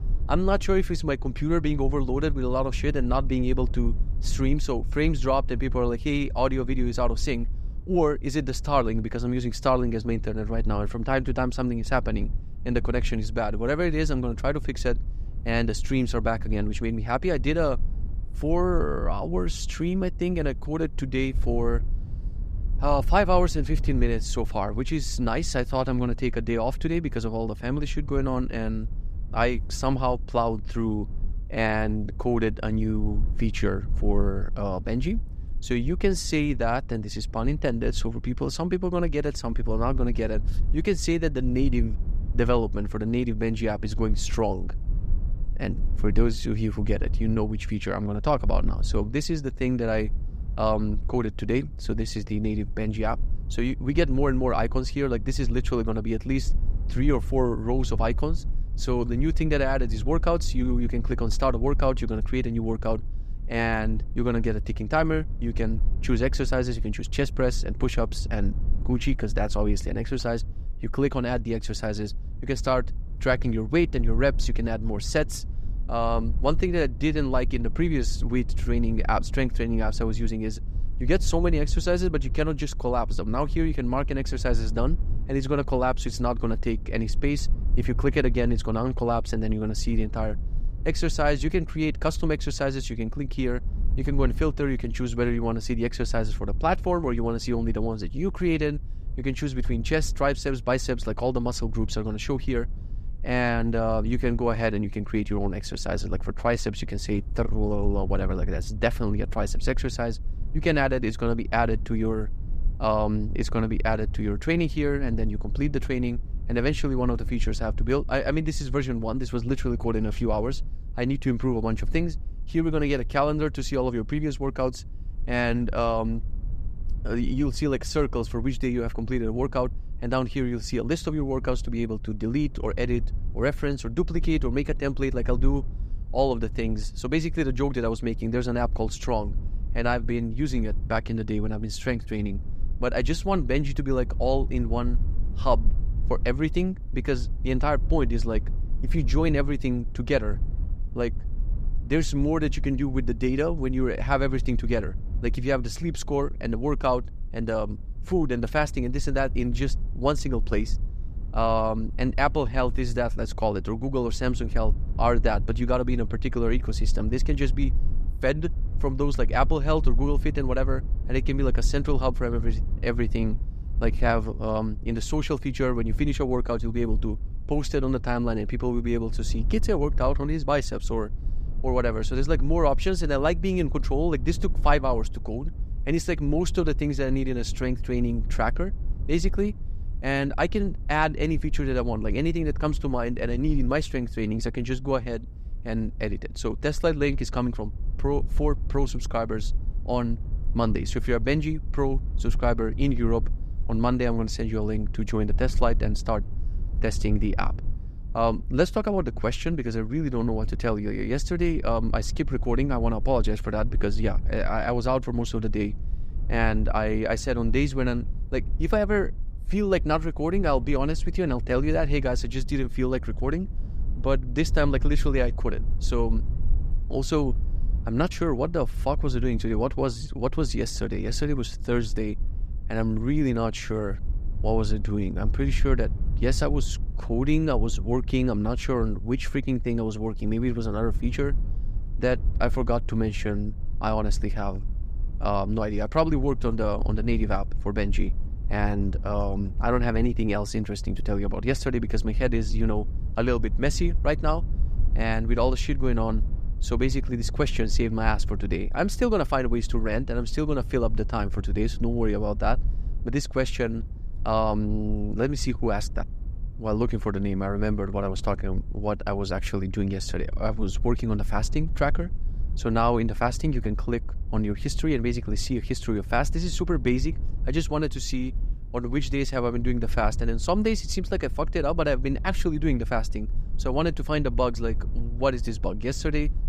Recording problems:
low rumble; faint; throughout; 20 dB below the speech

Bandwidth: 15.5 kHz